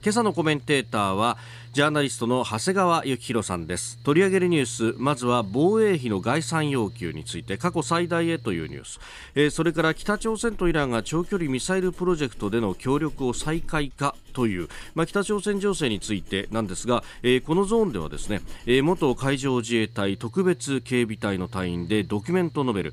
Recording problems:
machinery noise; faint; throughout; 20 dB below the speech

